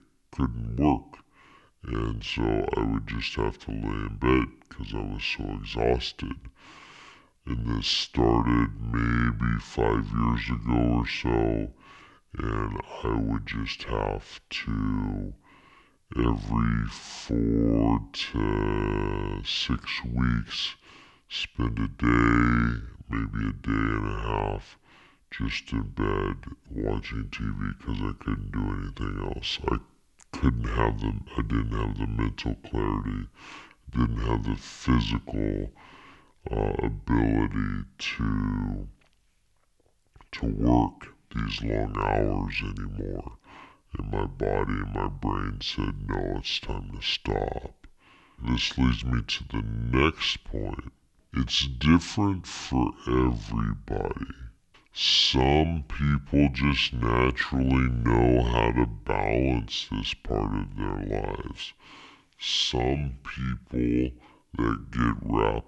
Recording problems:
wrong speed and pitch; too slow and too low; 0.6 times normal speed

